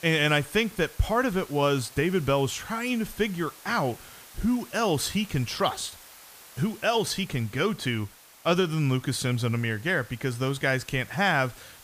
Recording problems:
hiss; faint; throughout; 20 dB below the speech

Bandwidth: 15 kHz